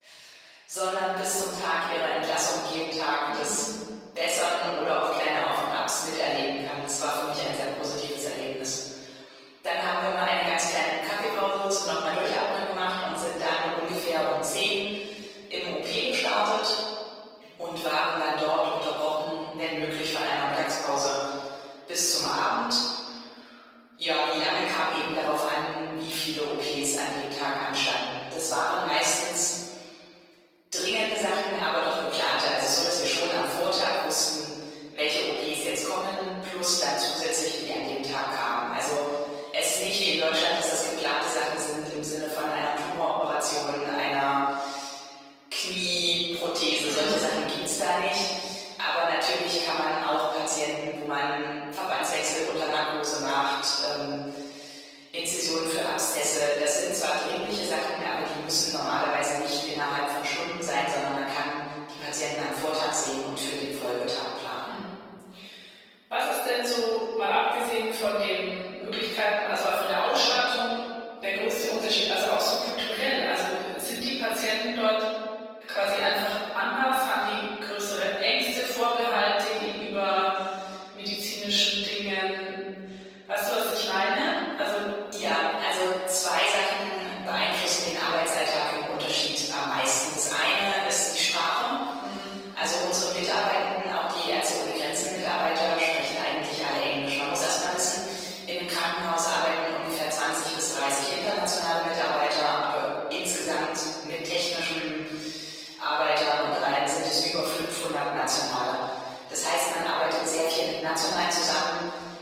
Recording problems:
room echo; strong; dies away in 1.7 s
off-mic speech; far
thin; very; fading below 550 Hz
garbled, watery; slightly; nothing above 16 kHz

